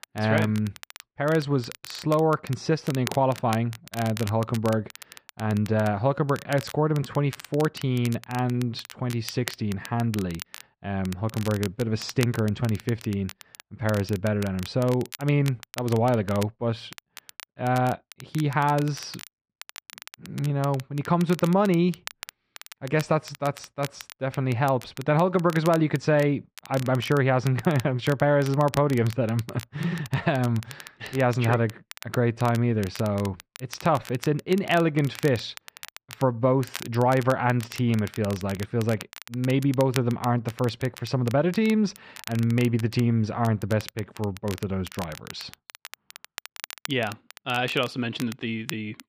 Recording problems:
muffled; slightly; fading above 3 kHz
crackle, like an old record; noticeable; 15 dB below the speech

